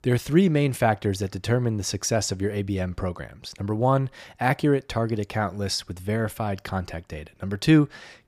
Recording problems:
none

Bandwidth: 15 kHz